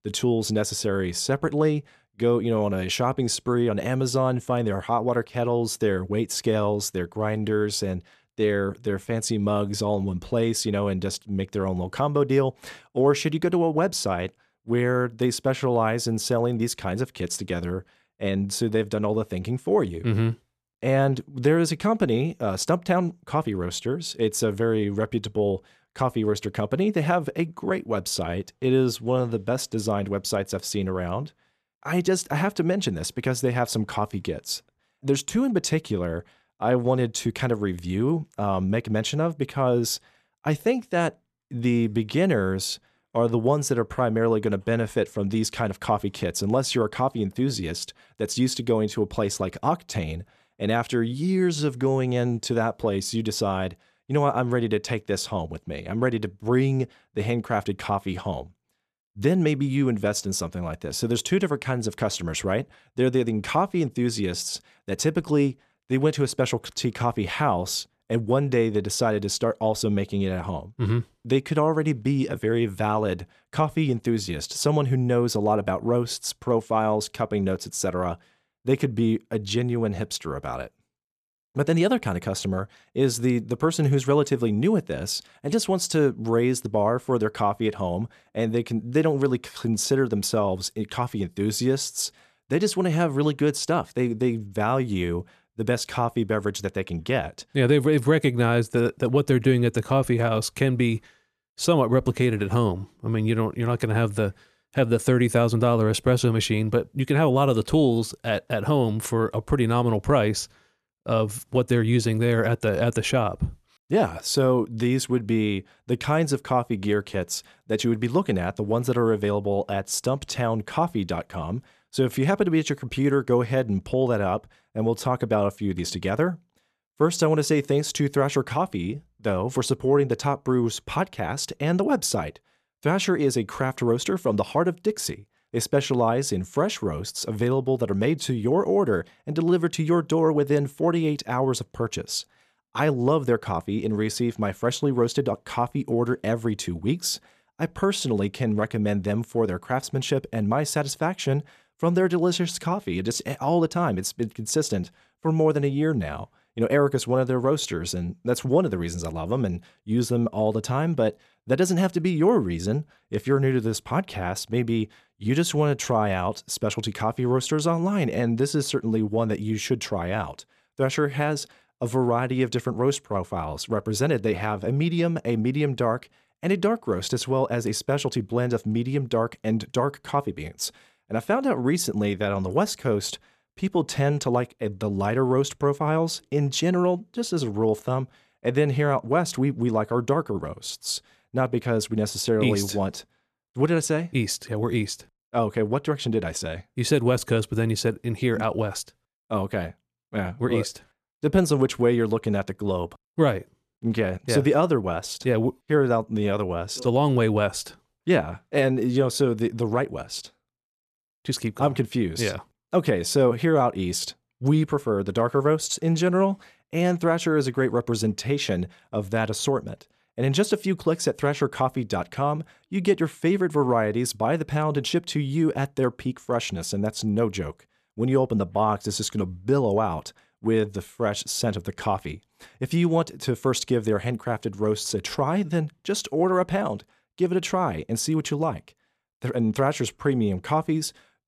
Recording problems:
none

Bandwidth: 13.5 kHz